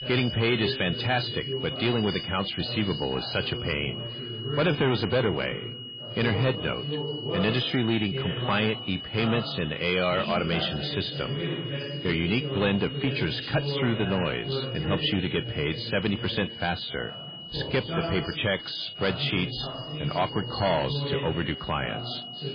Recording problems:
garbled, watery; badly
distortion; slight; 5% of the sound clipped
high-pitched whine; loud; throughout; 3 kHz, 9 dB below the speech
background chatter; loud; throughout; 2 voices, 7 dB below the speech

